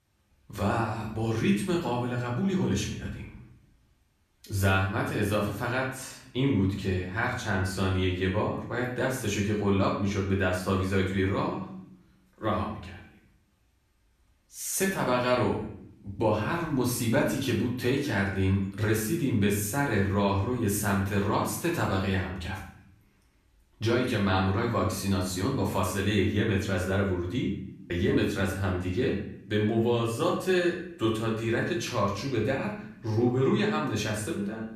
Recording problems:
off-mic speech; far
room echo; noticeable; dies away in 0.6 s

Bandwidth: 14.5 kHz